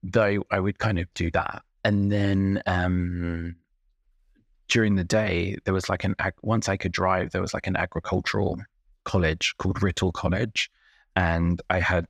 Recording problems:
none

